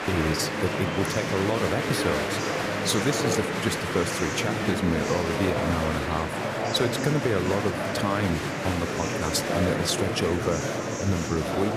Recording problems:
murmuring crowd; very loud; throughout; as loud as the speech
train or aircraft noise; very faint; throughout; 20 dB below the speech

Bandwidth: 14.5 kHz